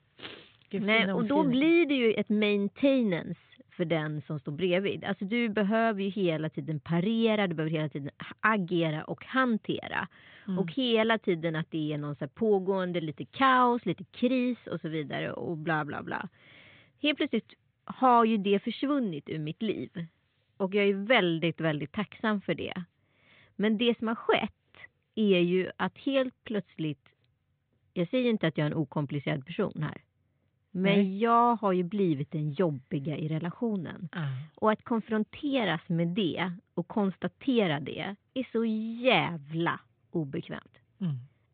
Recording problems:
high frequencies cut off; severe; nothing above 4 kHz

